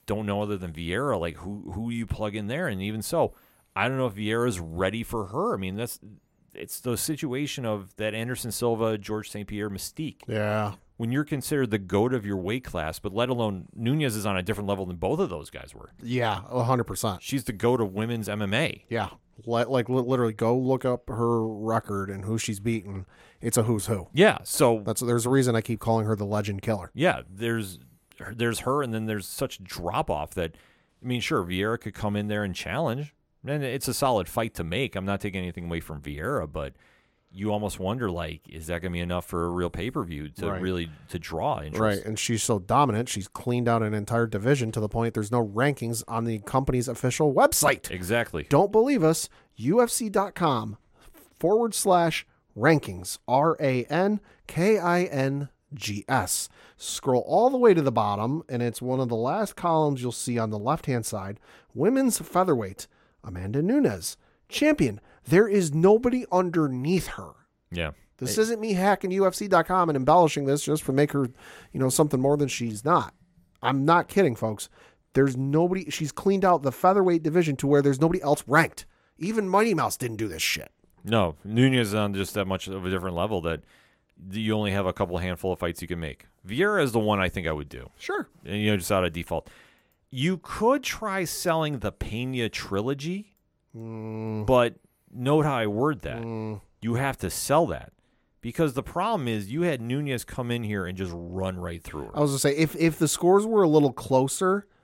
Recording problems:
none

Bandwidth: 16.5 kHz